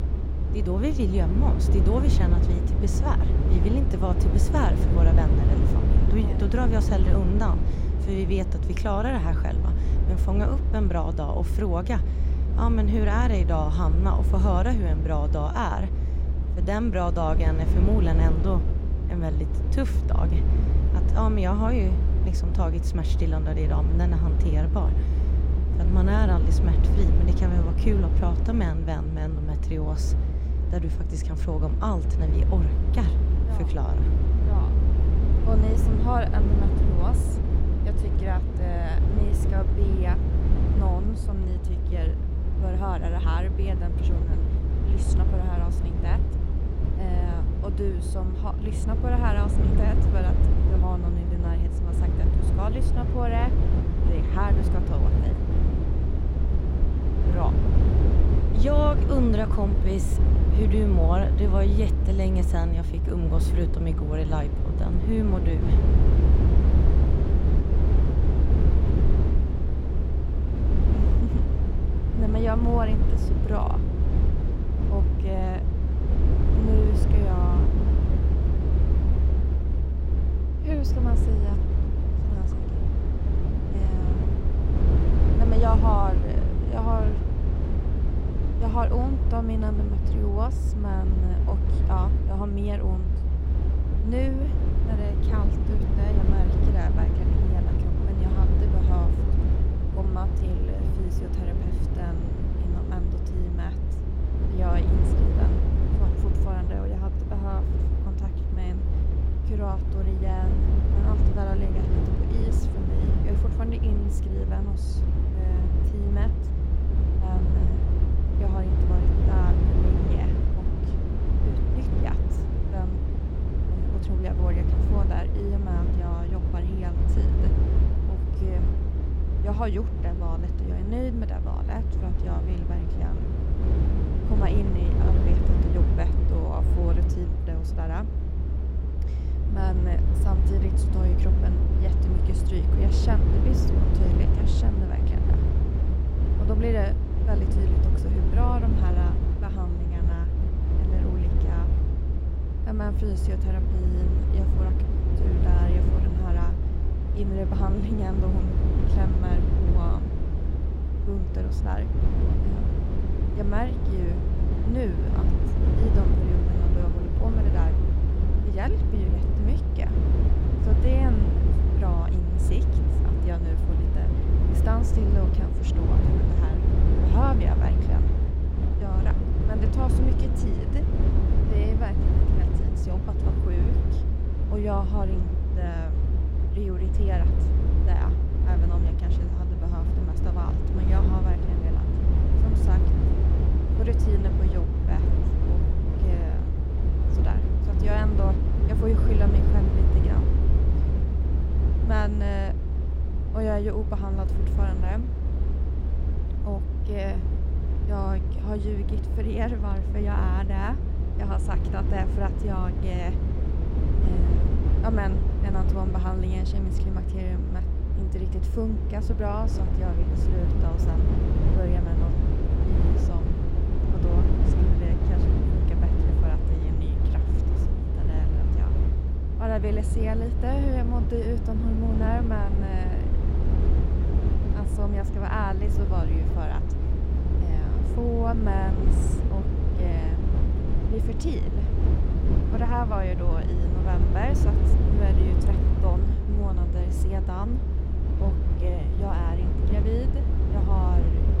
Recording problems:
low rumble; loud; throughout; 3 dB below the speech

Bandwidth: 16 kHz